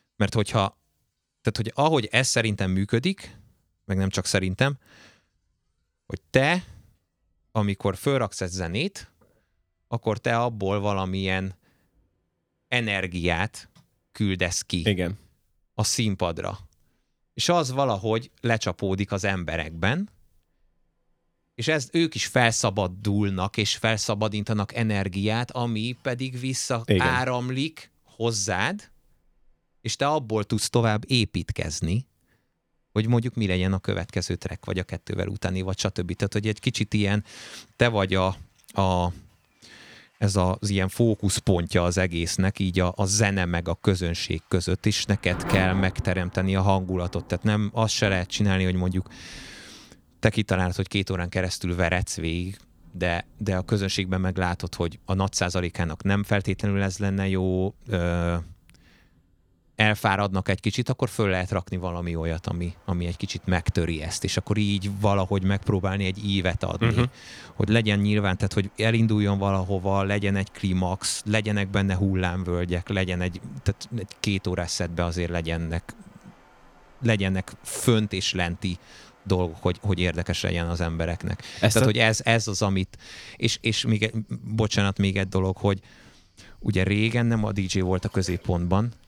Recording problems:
rain or running water; faint; throughout; 20 dB below the speech

